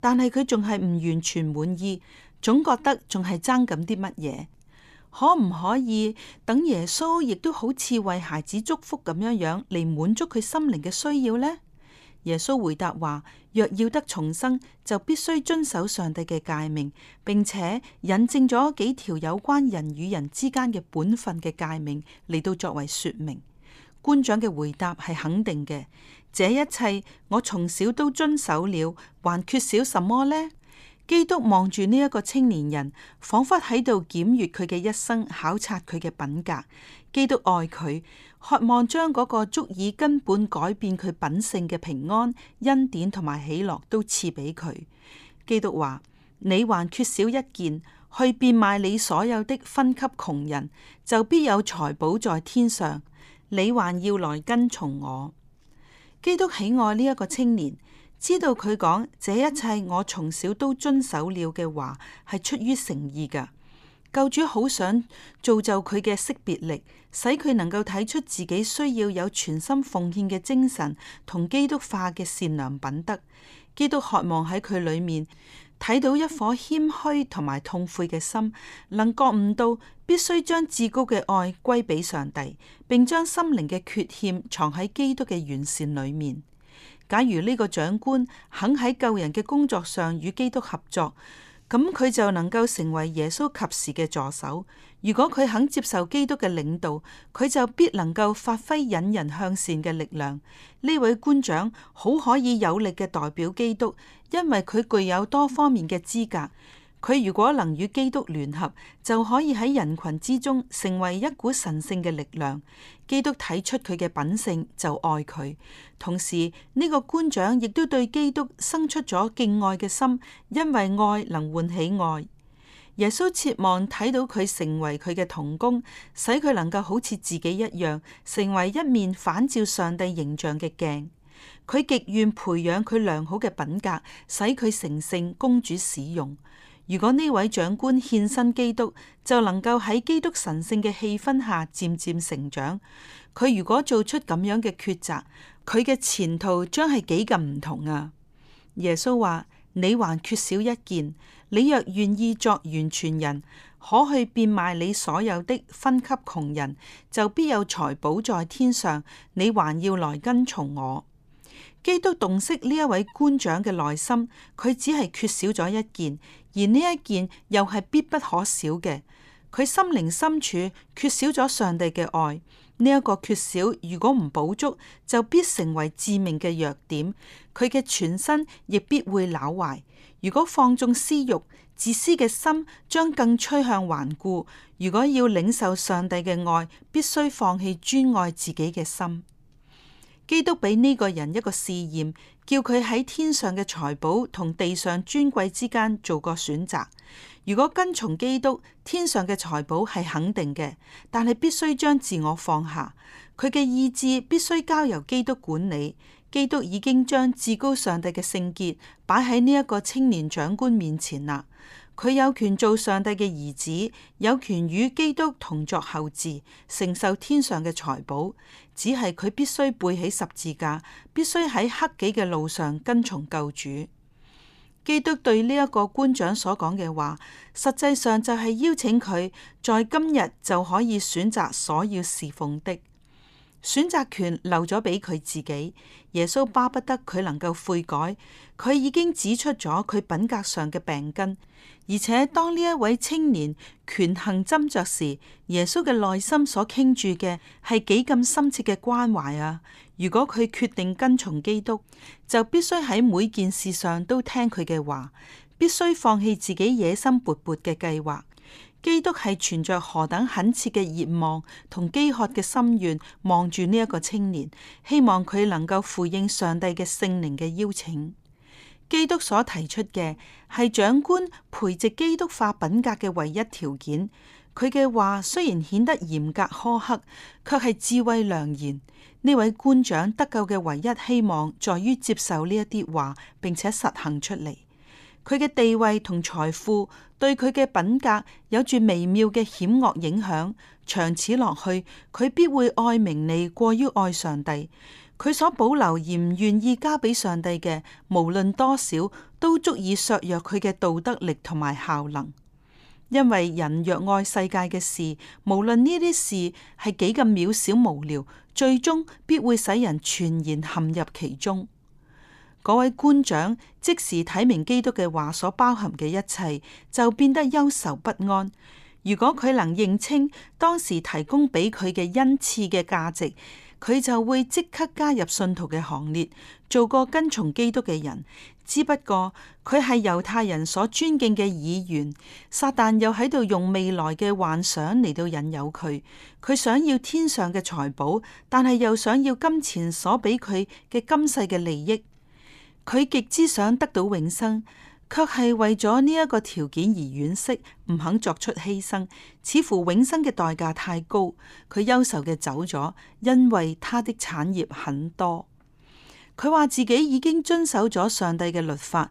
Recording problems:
none

